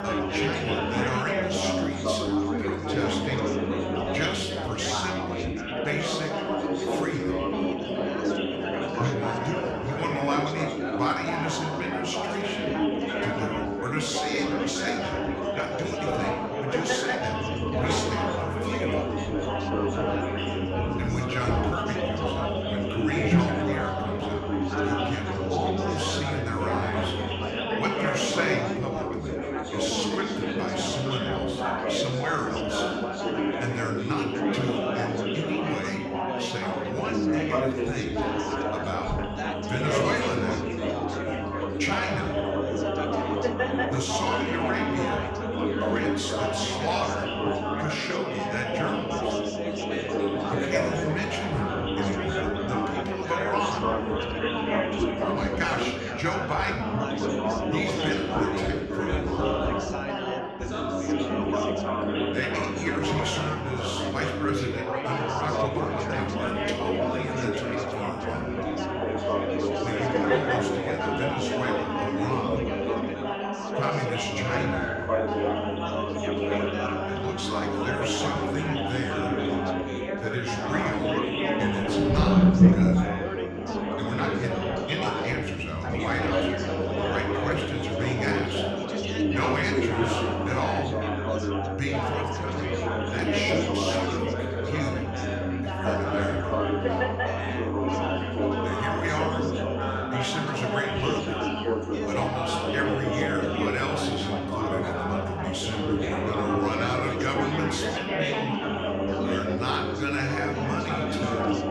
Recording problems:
room echo; slight; dies away in 0.8 s
off-mic speech; somewhat distant
chatter from many people; very loud; throughout; 4 dB above the speech
background music; faint; throughout; 20 dB below the speech

